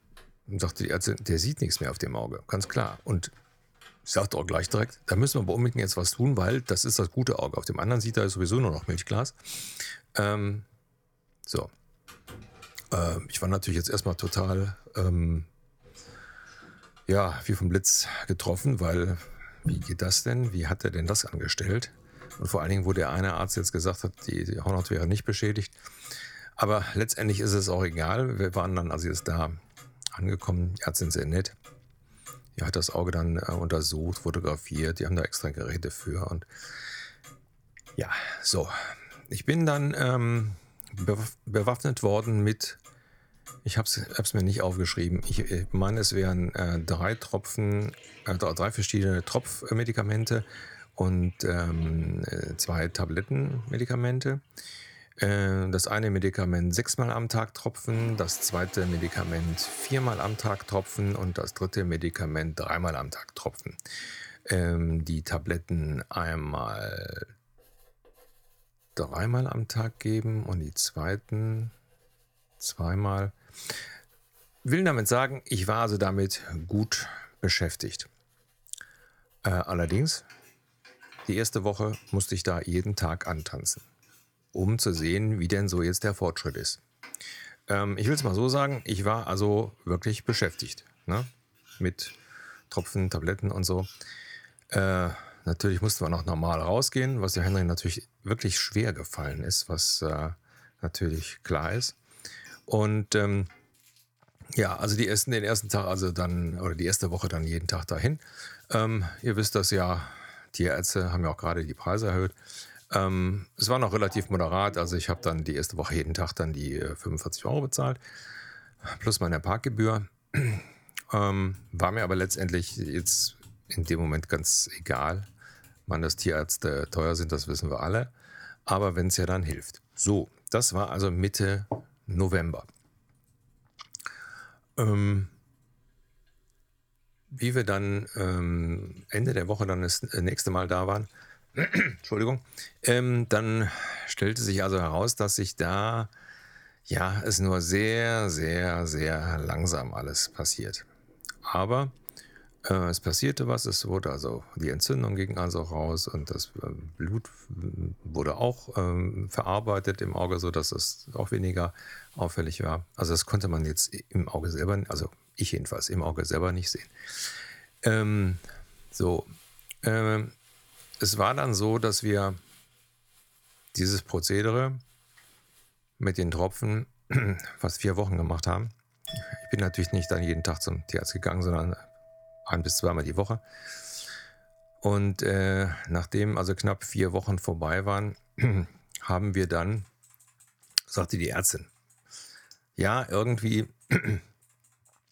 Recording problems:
household noises; faint; throughout; 25 dB below the speech

